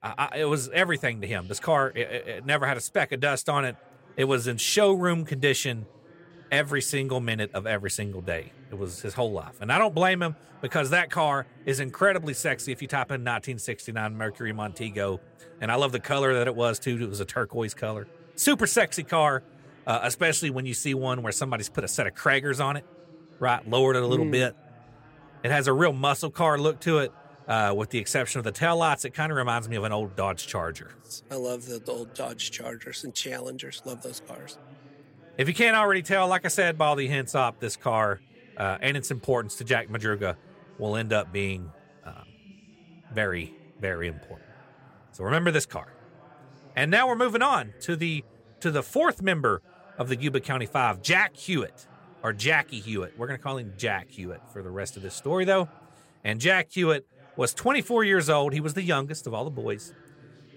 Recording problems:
chatter from many people; faint; throughout; 25 dB below the speech

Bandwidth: 16 kHz